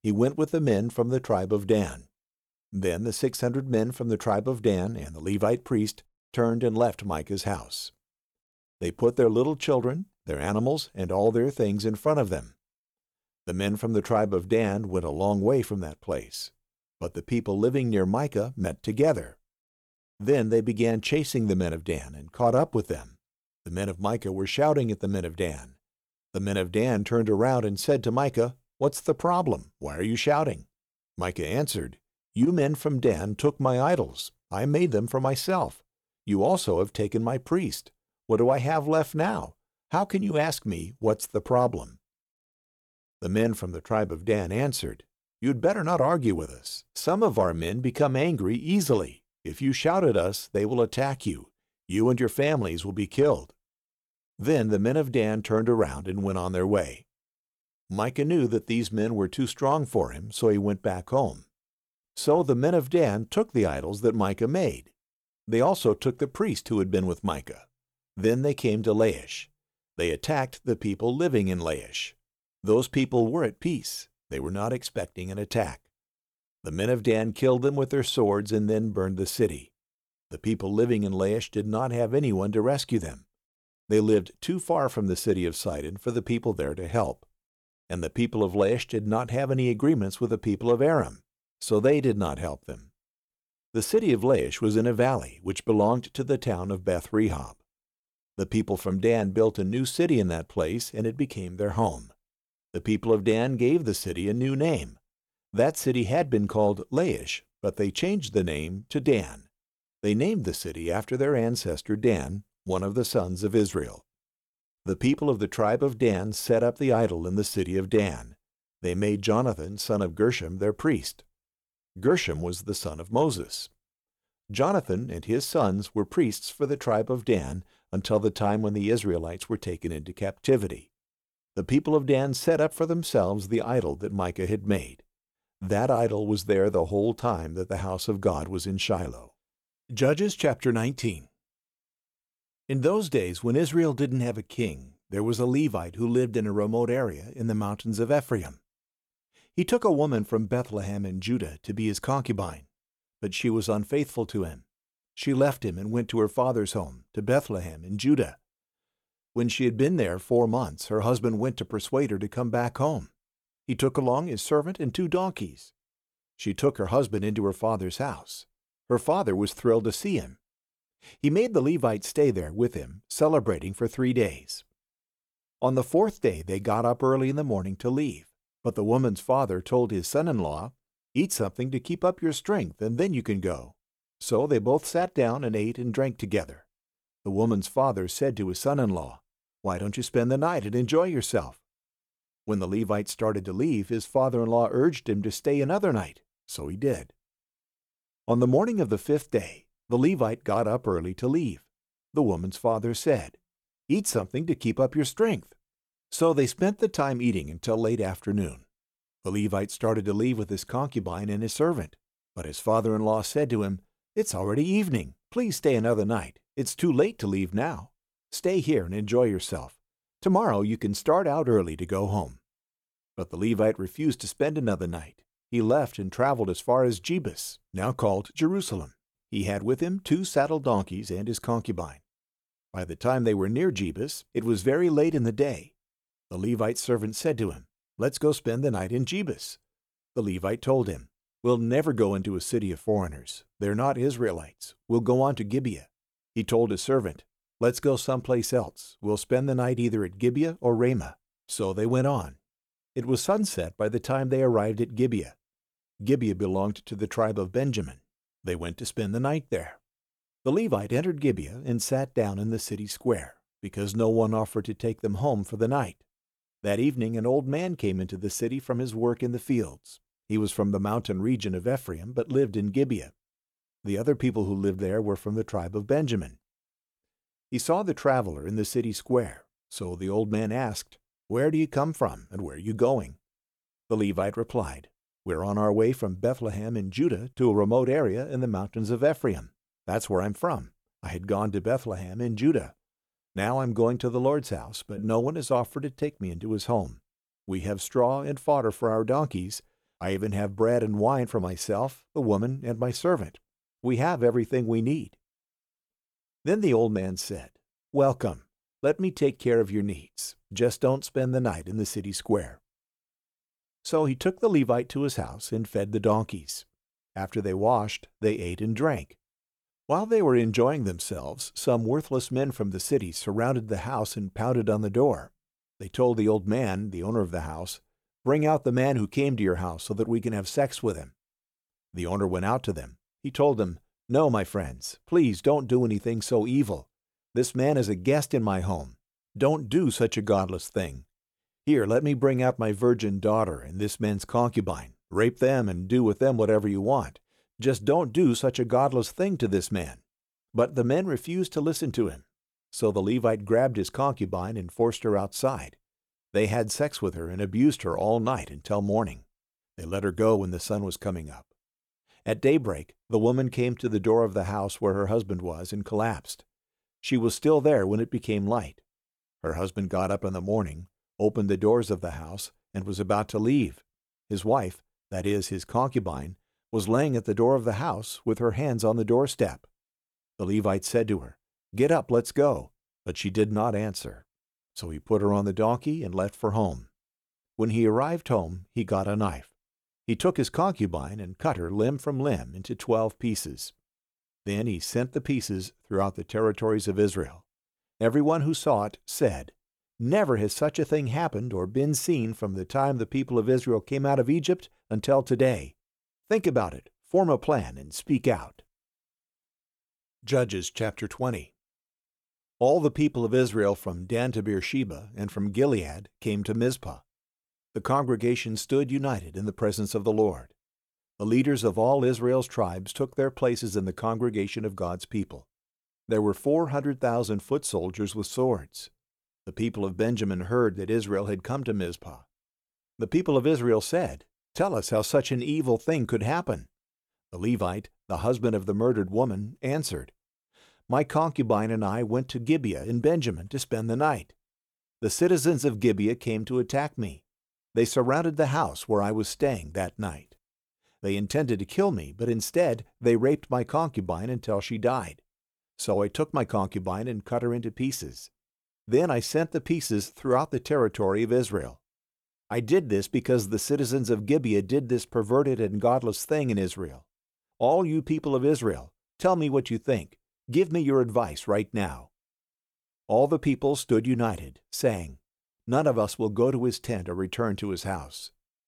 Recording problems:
none

